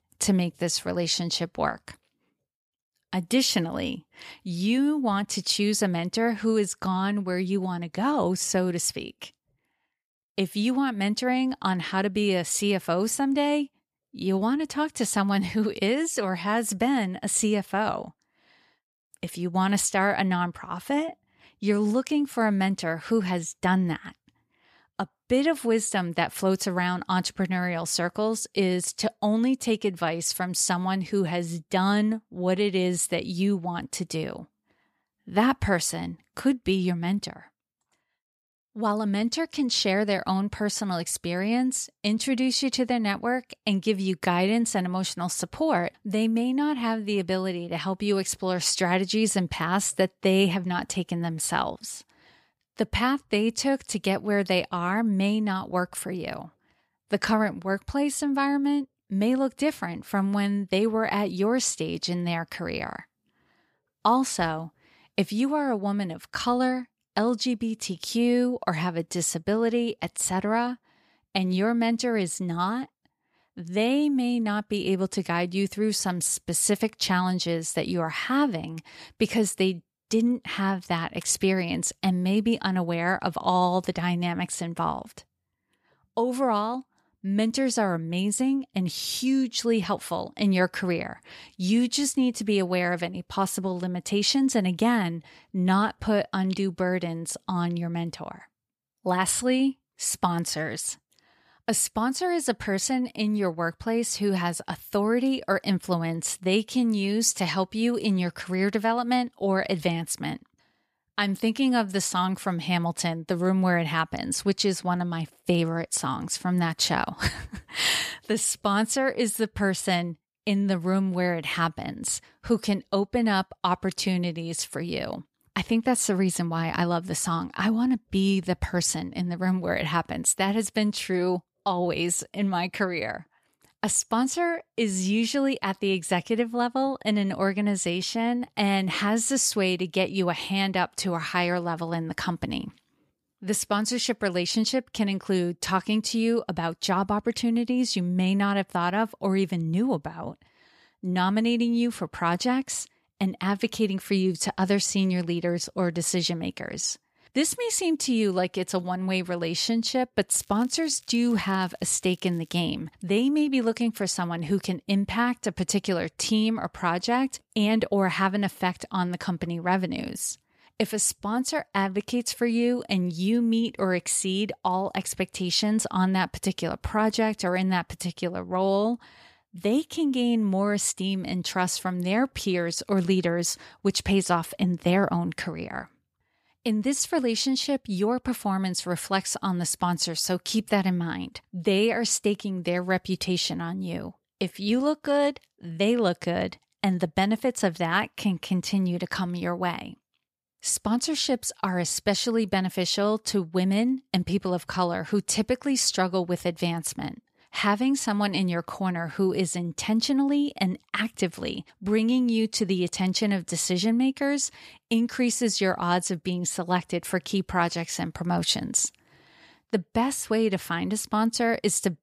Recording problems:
crackling; faint; from 2:40 to 2:43; 30 dB below the speech

